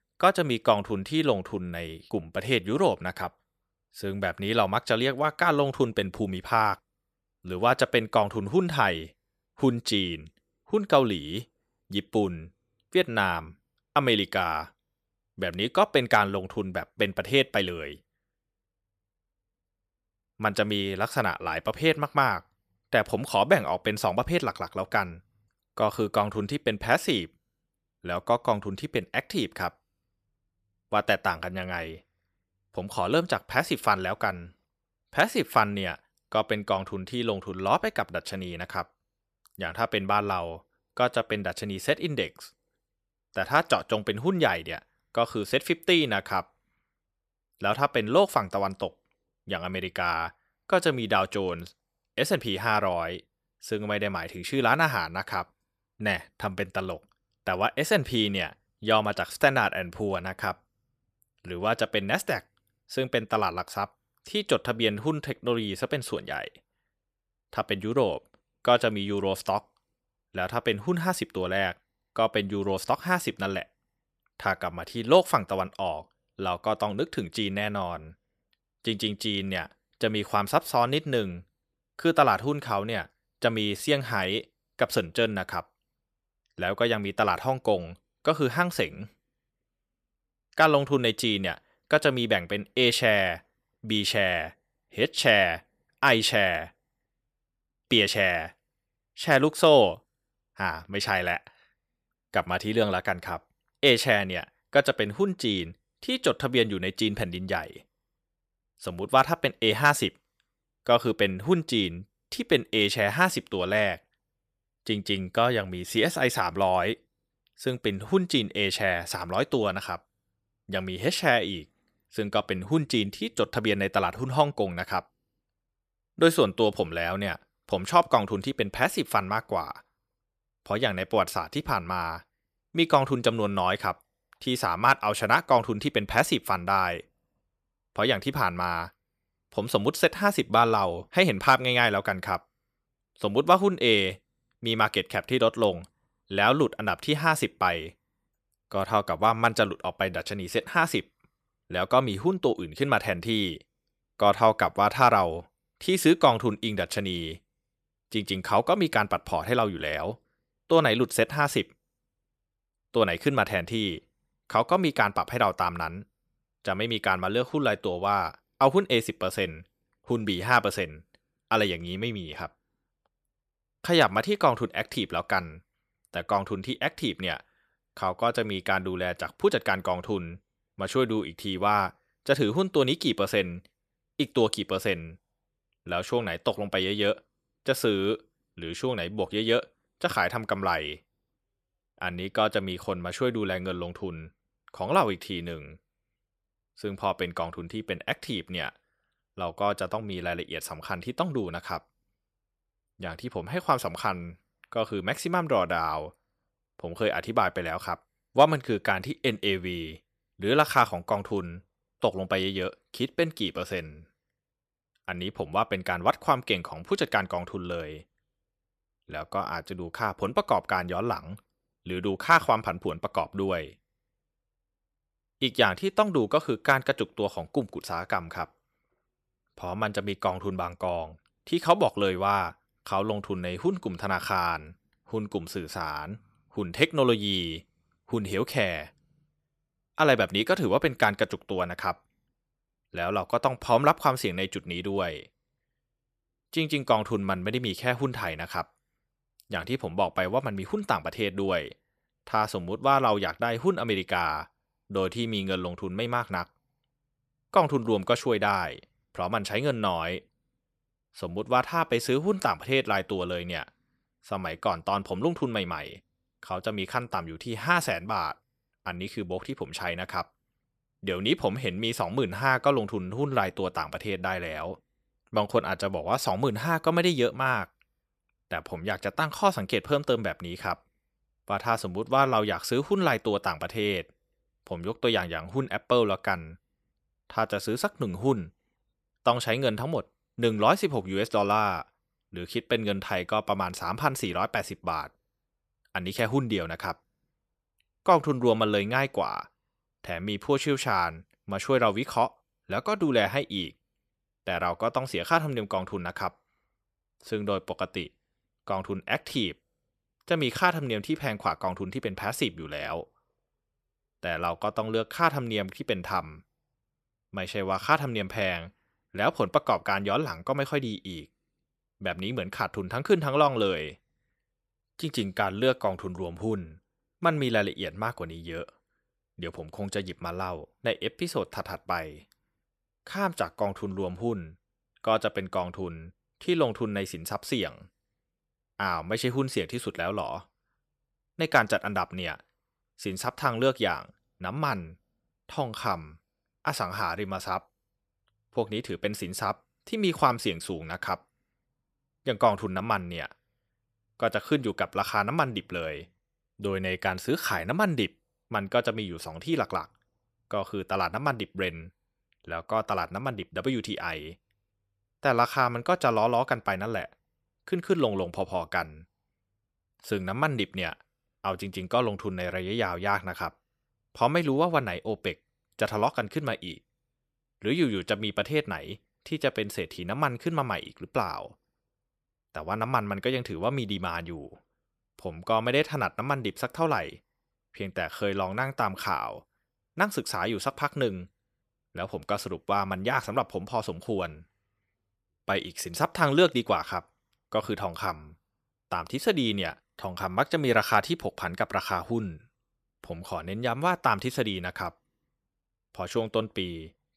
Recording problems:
none

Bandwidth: 14.5 kHz